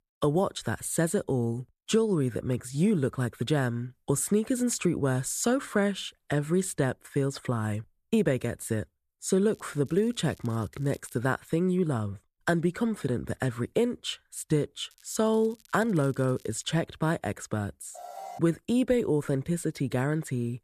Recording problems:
crackling; faint; from 9.5 to 11 s and from 15 to 17 s; 30 dB below the speech
alarm; faint; at 18 s; peak 15 dB below the speech

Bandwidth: 14 kHz